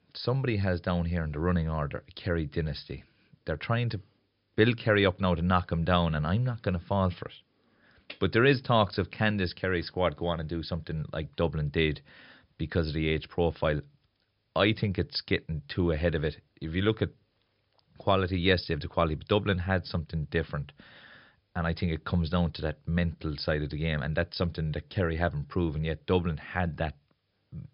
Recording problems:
high frequencies cut off; noticeable; nothing above 5.5 kHz

